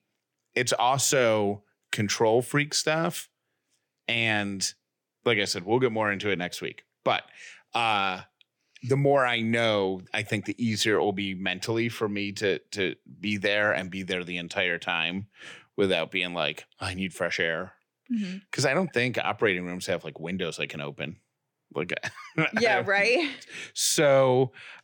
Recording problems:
none

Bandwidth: 18 kHz